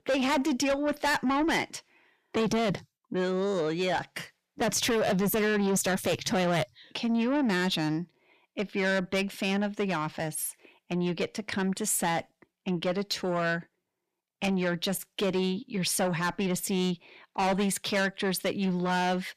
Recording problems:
distortion; heavy; 7 dB below the speech

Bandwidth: 14.5 kHz